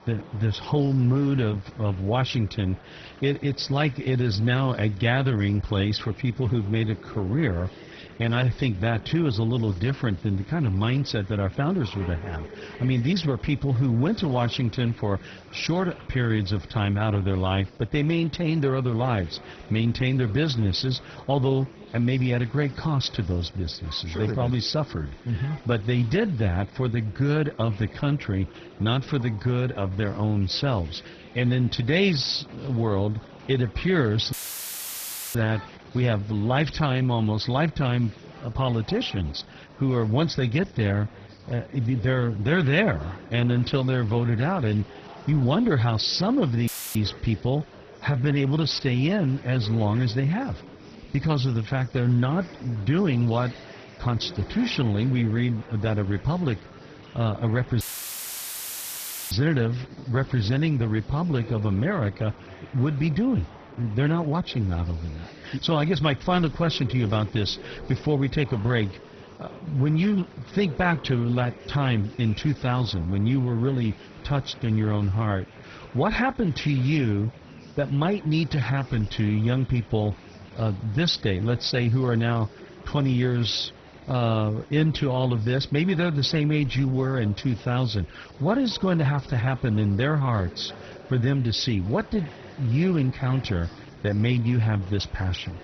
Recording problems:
garbled, watery; badly; nothing above 6 kHz
murmuring crowd; noticeable; throughout; 20 dB below the speech
audio cutting out; filled with static; at 34 s for 1 s, at 47 s and at 58 s for 1.5 s

